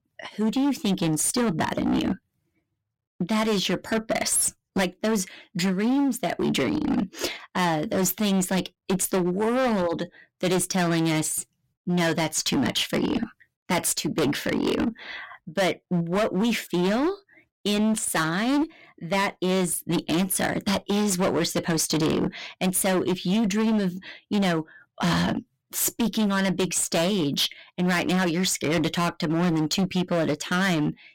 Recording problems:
distortion; heavy; 19% of the sound clipped

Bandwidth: 16.5 kHz